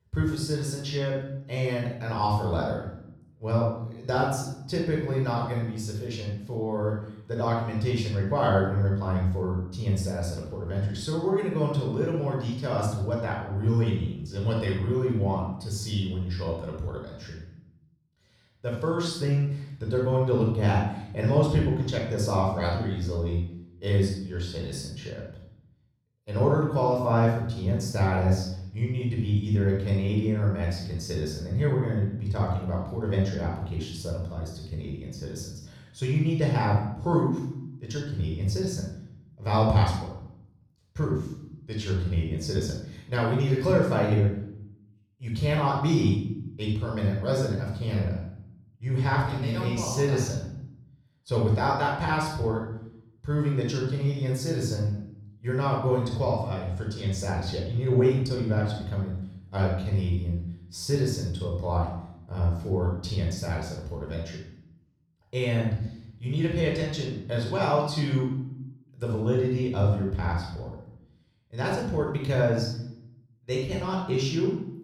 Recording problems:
off-mic speech; far
room echo; noticeable; dies away in 0.6 s

